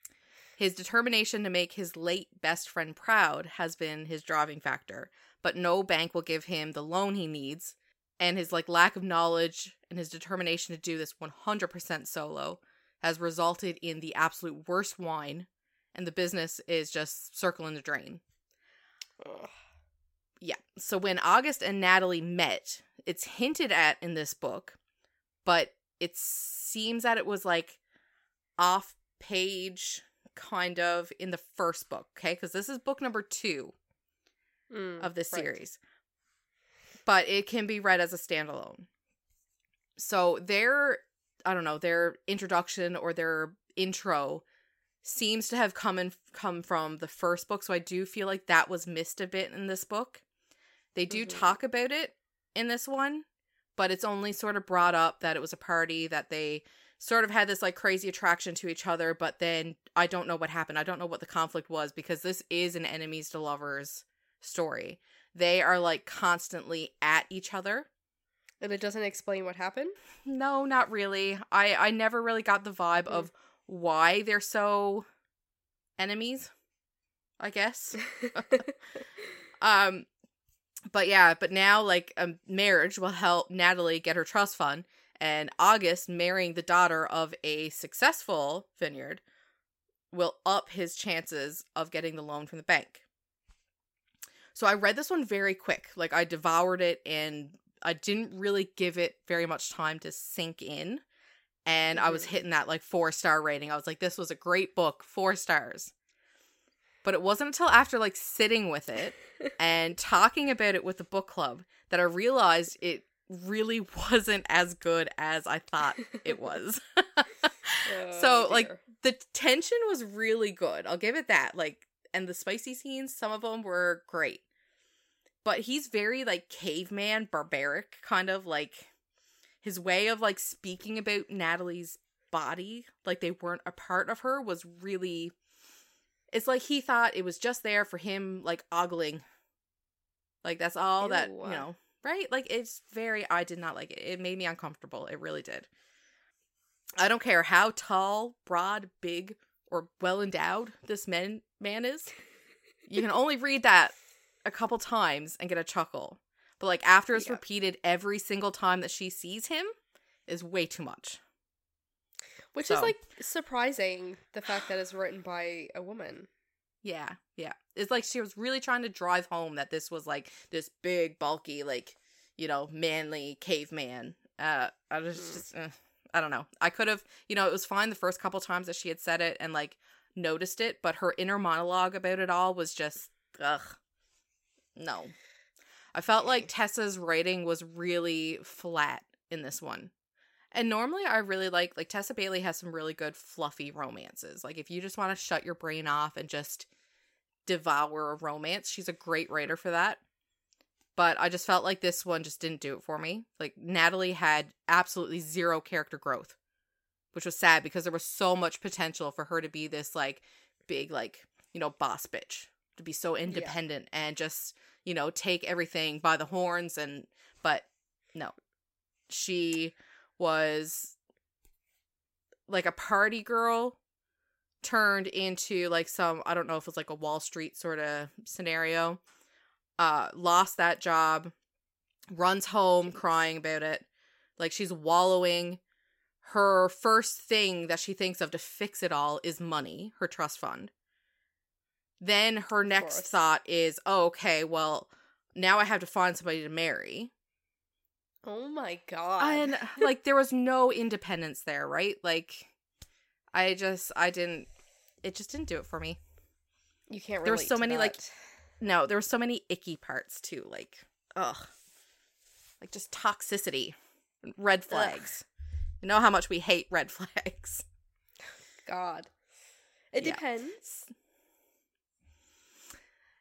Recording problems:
none

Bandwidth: 16 kHz